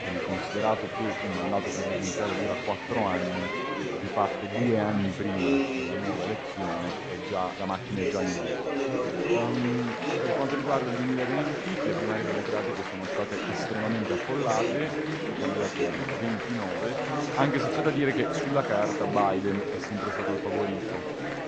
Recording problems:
garbled, watery; slightly; nothing above 7.5 kHz
chatter from many people; very loud; throughout; 1 dB above the speech

